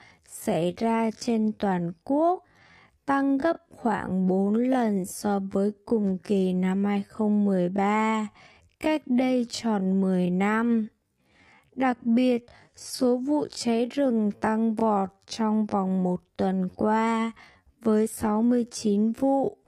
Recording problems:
wrong speed, natural pitch; too slow; 0.5 times normal speed

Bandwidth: 15 kHz